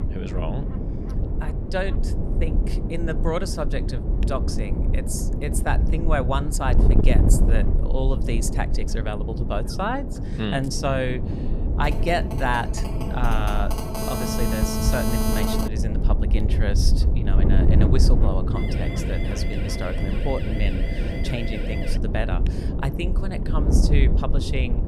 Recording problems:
wind noise on the microphone; heavy; 6 dB below the speech
phone ringing; loud; from 12 to 16 s; peak 4 dB above the speech
siren; noticeable; from 19 to 22 s; peak 7 dB below the speech

